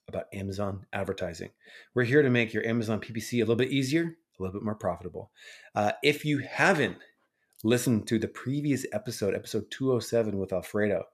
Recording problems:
none

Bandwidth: 14.5 kHz